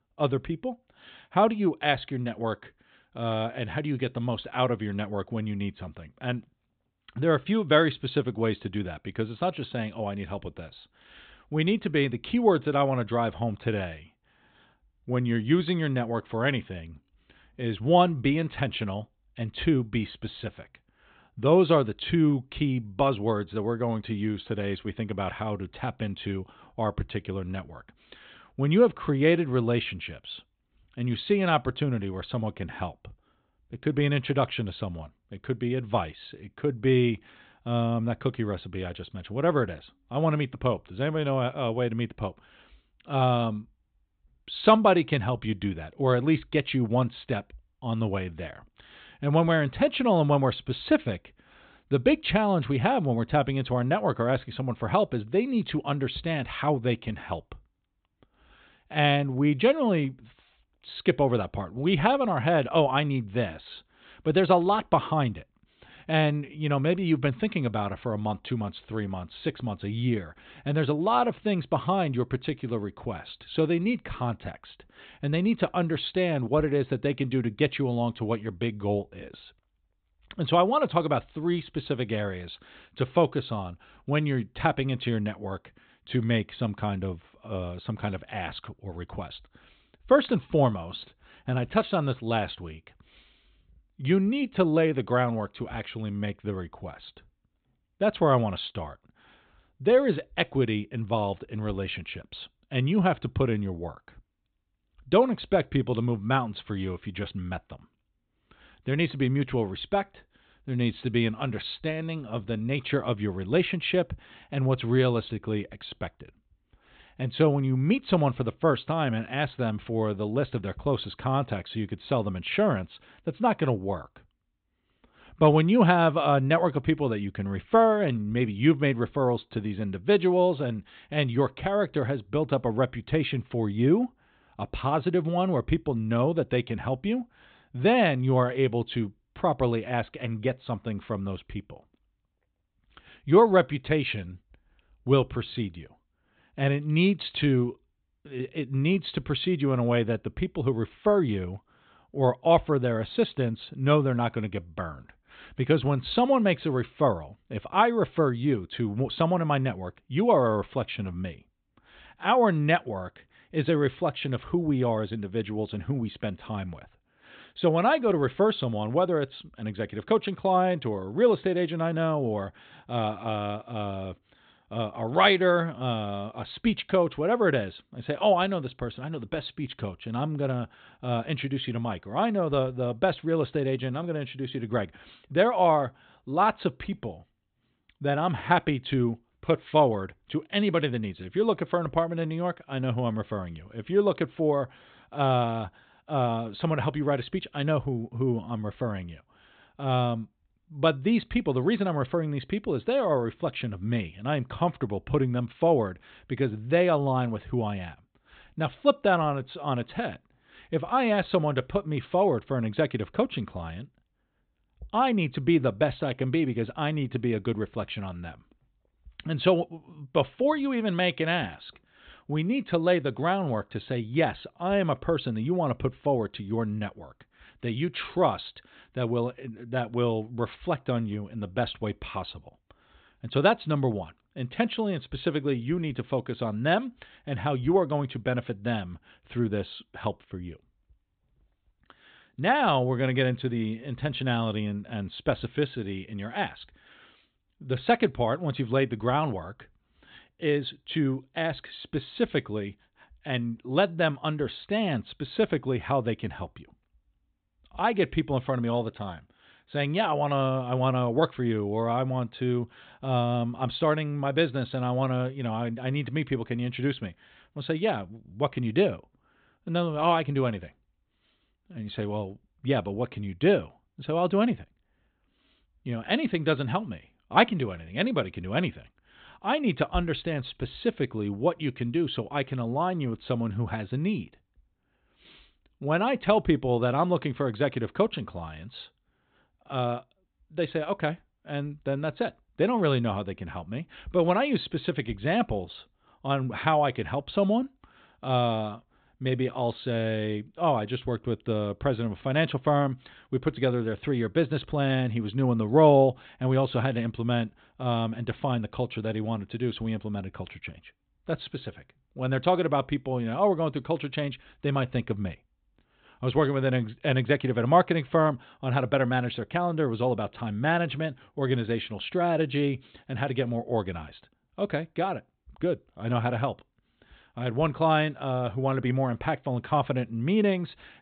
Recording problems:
high frequencies cut off; severe; nothing above 4 kHz

